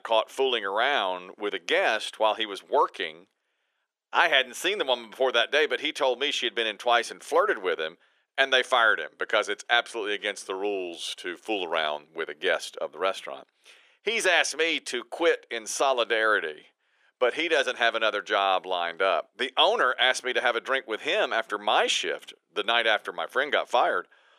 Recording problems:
thin; very; fading below 400 Hz

